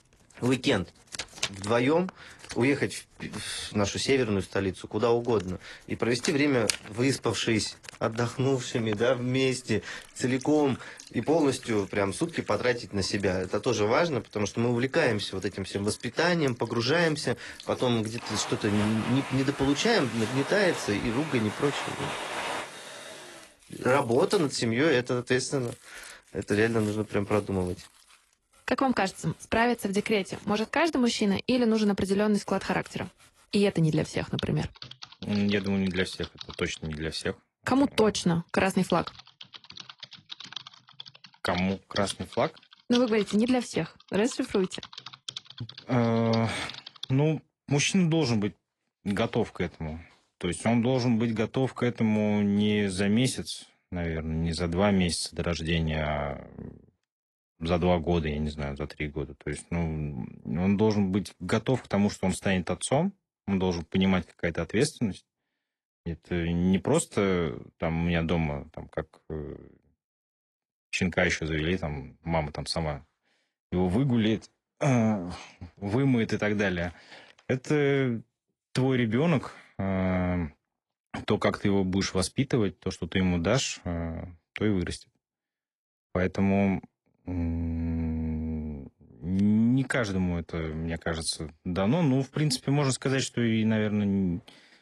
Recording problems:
garbled, watery; slightly
household noises; noticeable; until 47 s; 15 dB below the speech

